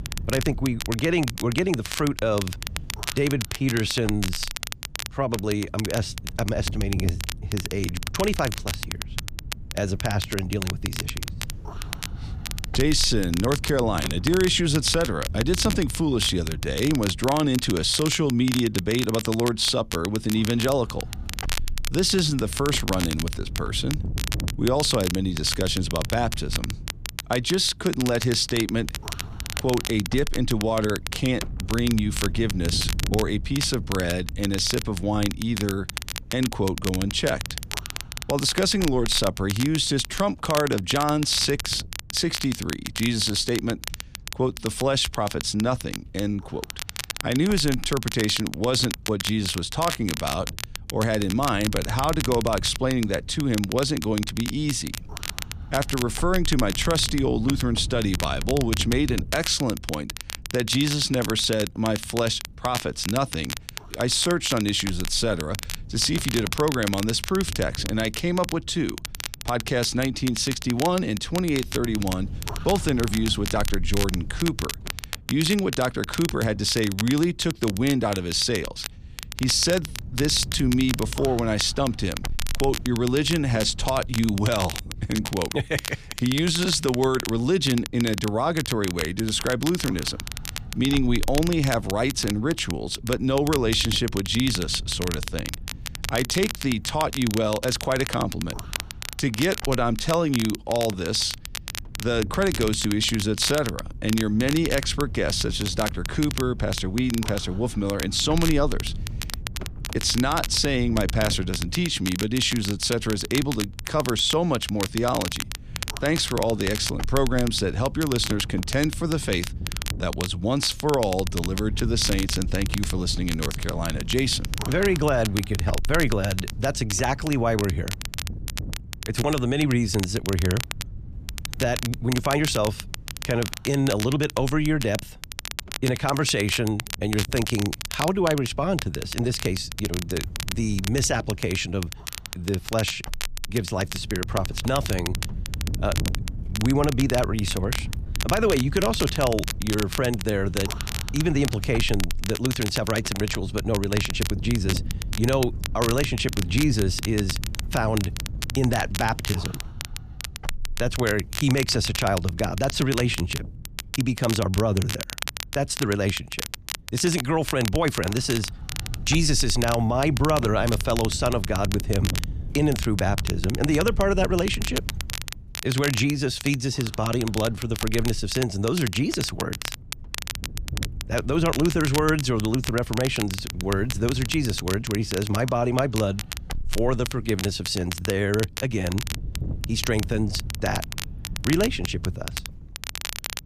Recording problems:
crackle, like an old record; loud; 9 dB below the speech
wind noise on the microphone; occasional gusts; 20 dB below the speech

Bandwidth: 14.5 kHz